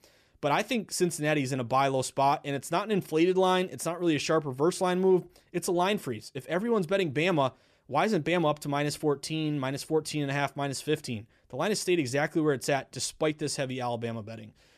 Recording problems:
none

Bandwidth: 14.5 kHz